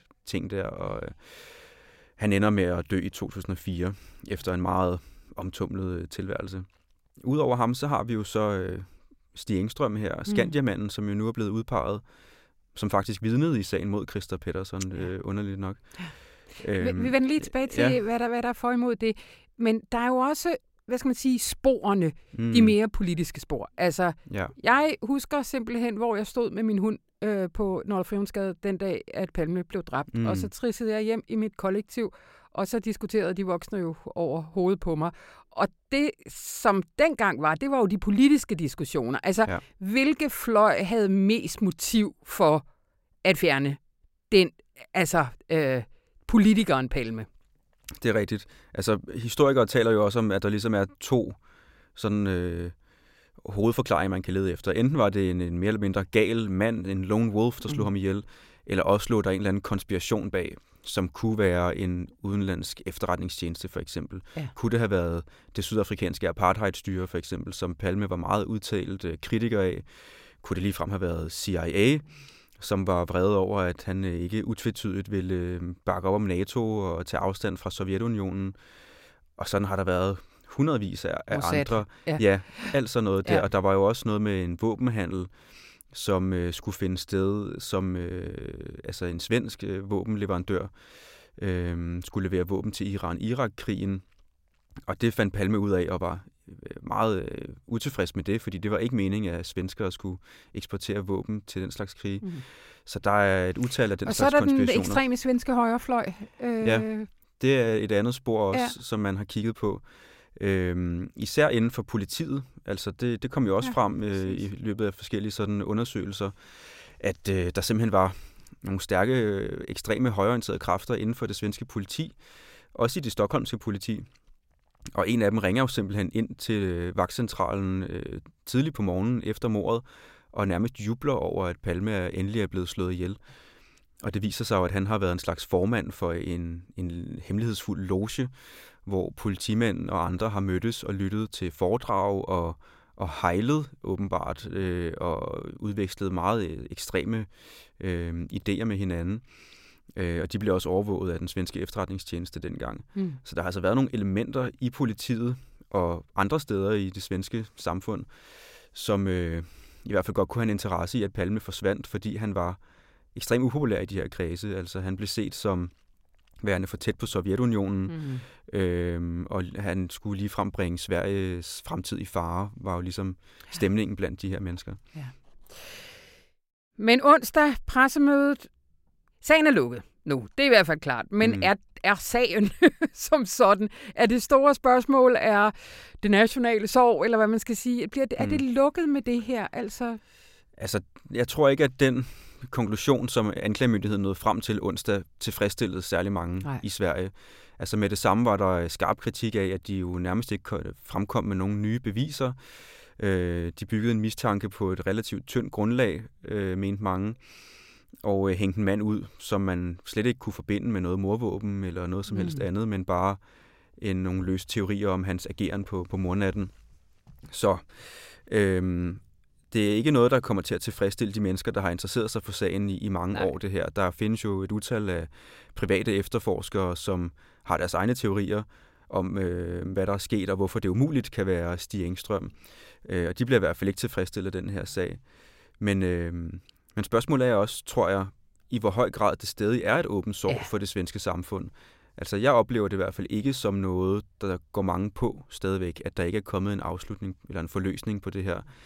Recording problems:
none

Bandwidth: 16 kHz